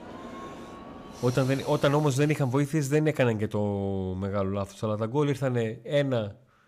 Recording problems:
train or aircraft noise; noticeable; until 2 s; 15 dB below the speech

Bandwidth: 15 kHz